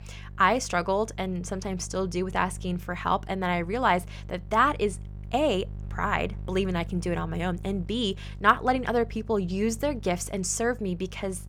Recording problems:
electrical hum; faint; throughout; 50 Hz, 30 dB below the speech

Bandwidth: 18.5 kHz